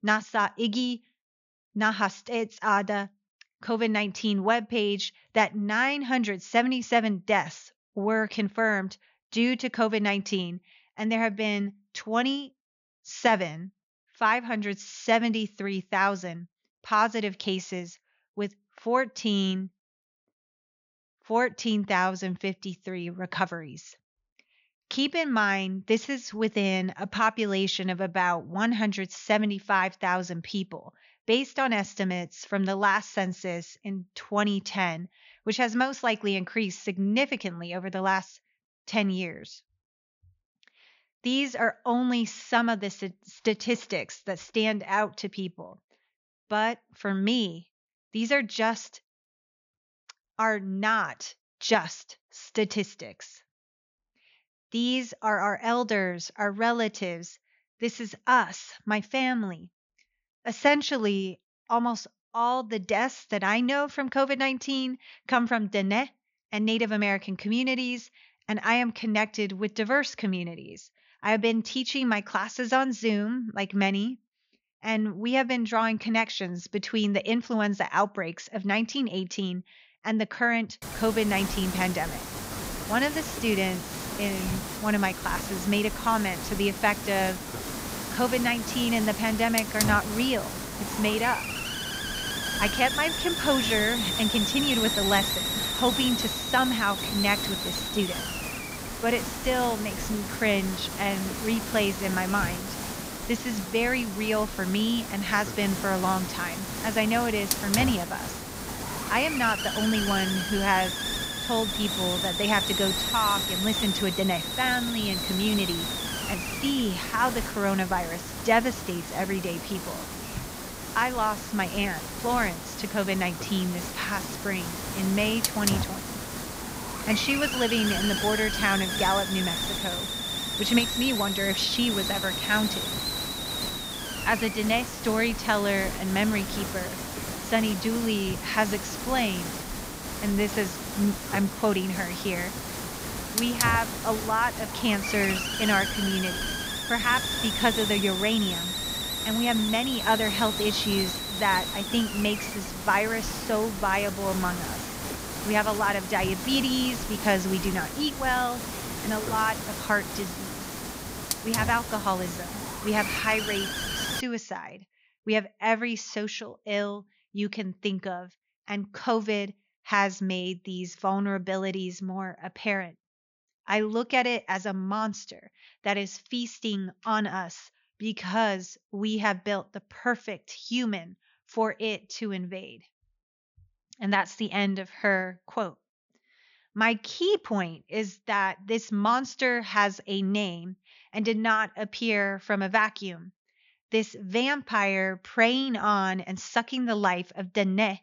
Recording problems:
high frequencies cut off; noticeable; nothing above 7 kHz
hiss; loud; from 1:21 to 2:44; 3 dB below the speech

